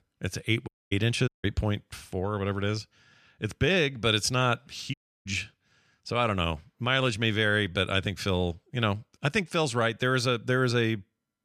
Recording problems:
audio cutting out; at 0.5 s, at 1.5 s and at 5 s

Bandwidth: 14 kHz